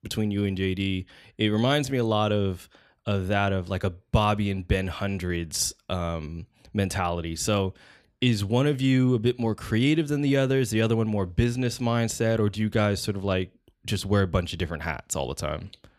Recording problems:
none

